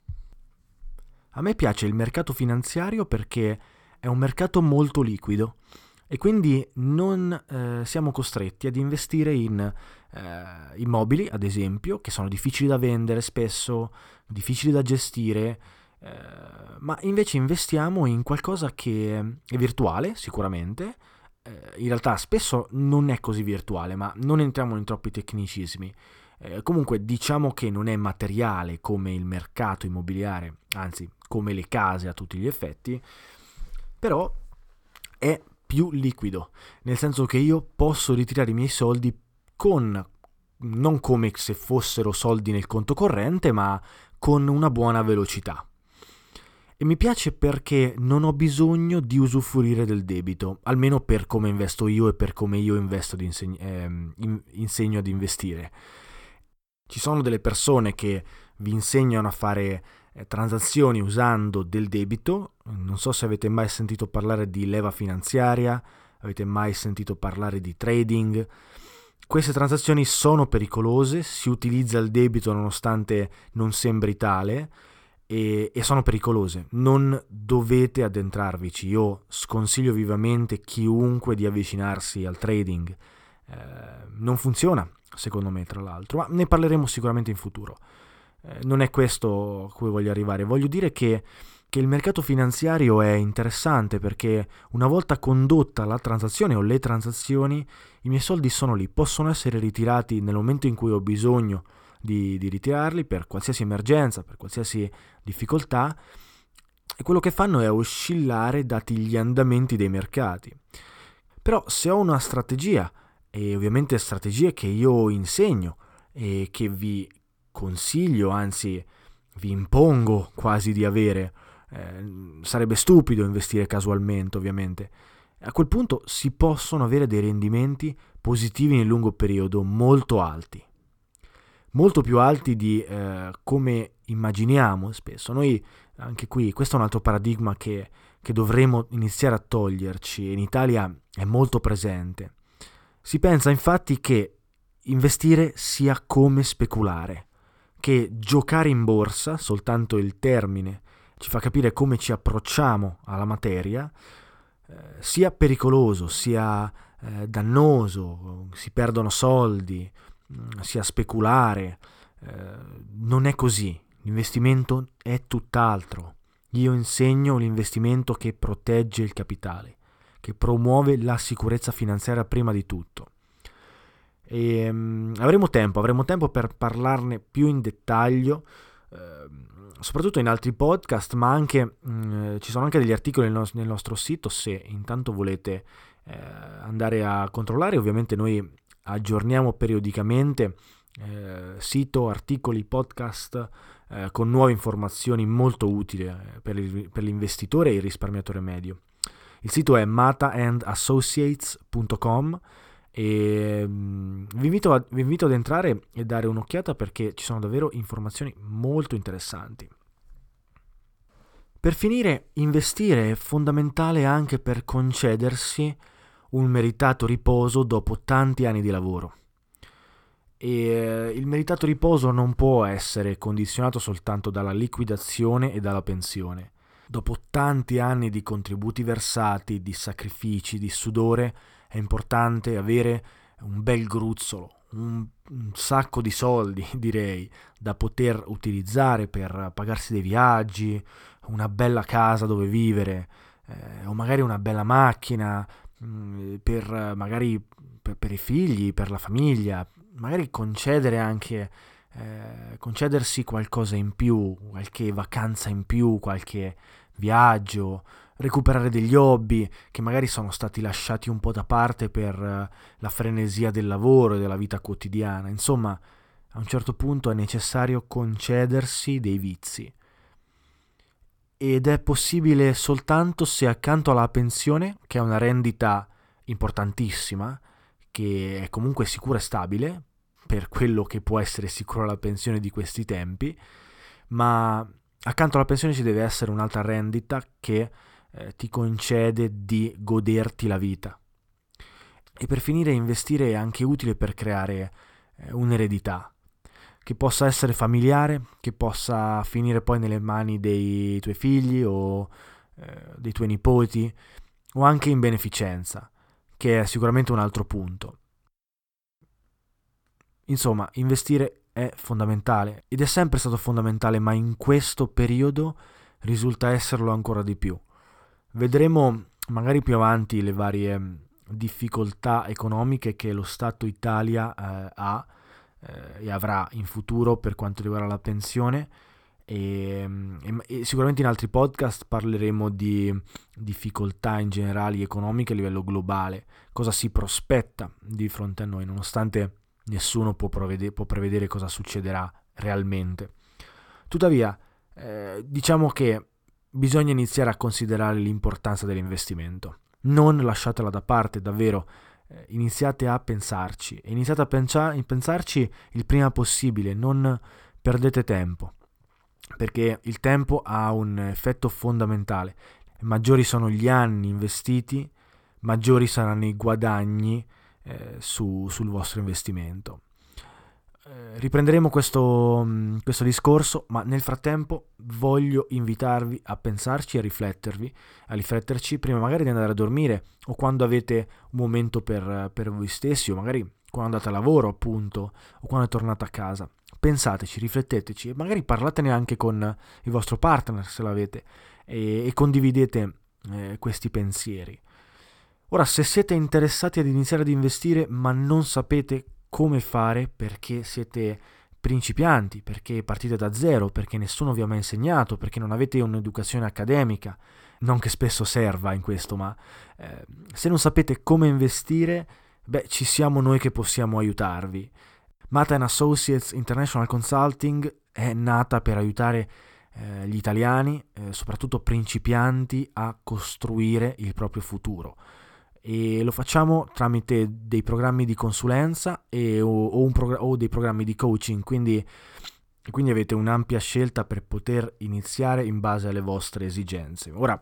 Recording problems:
none

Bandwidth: 18.5 kHz